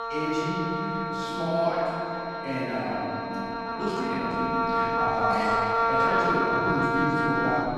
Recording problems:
room echo; strong; dies away in 2.8 s
off-mic speech; far
background music; very loud; throughout; 3 dB above the speech
high-pitched whine; noticeable; throughout; 4 kHz, 20 dB below the speech
voice in the background; faint; throughout; 25 dB below the speech
uneven, jittery; strongly; from 3.5 to 7 s

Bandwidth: 15 kHz